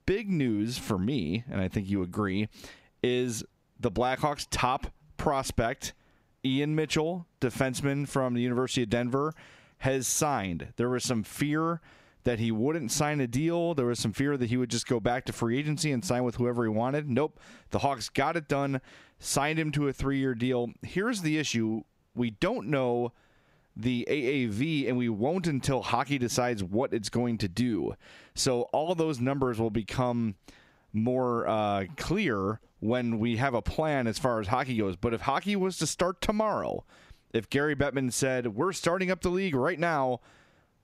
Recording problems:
squashed, flat; somewhat

